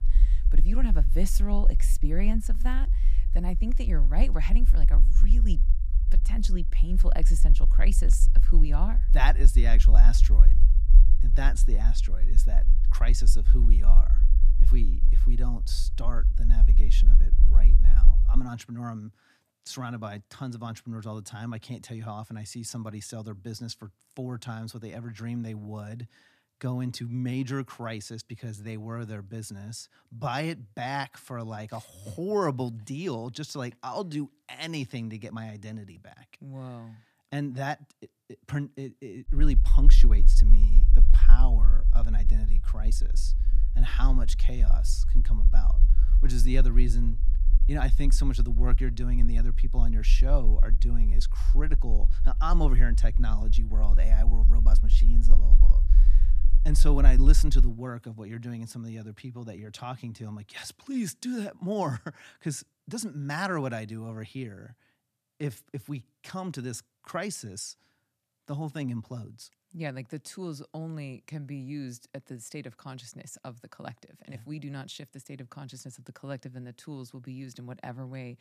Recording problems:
low rumble; noticeable; until 18 s and from 39 to 58 s; 10 dB below the speech

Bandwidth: 14.5 kHz